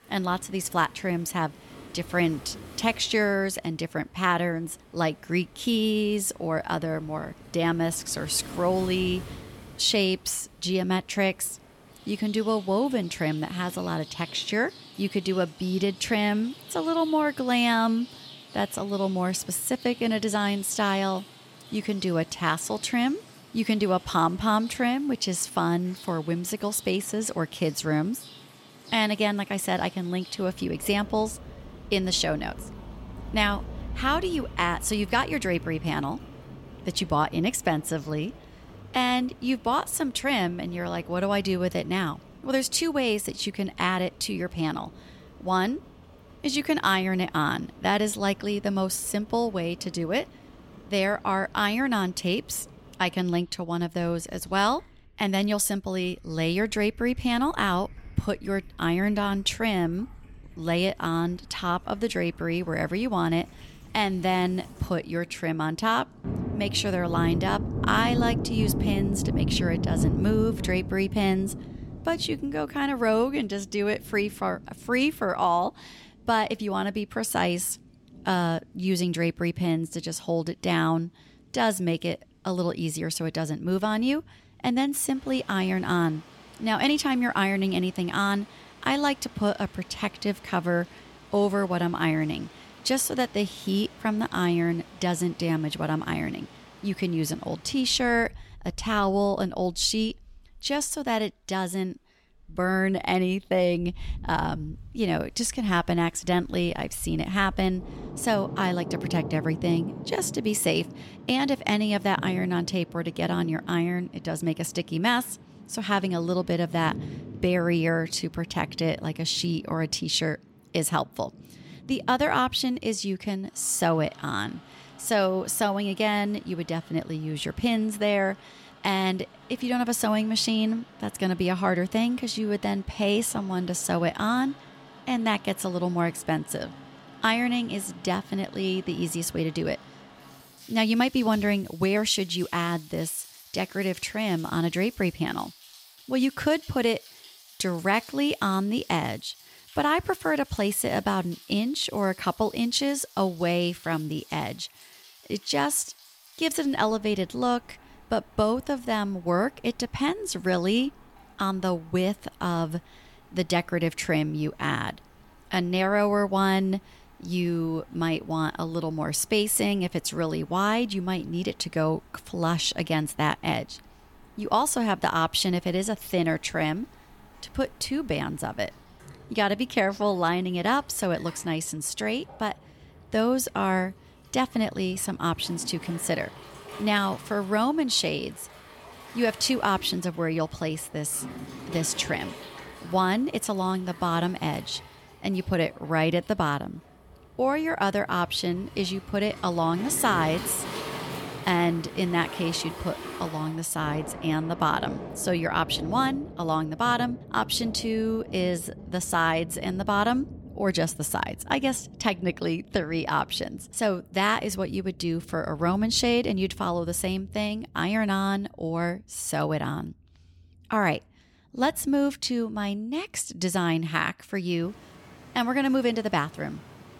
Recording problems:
rain or running water; noticeable; throughout; 15 dB below the speech

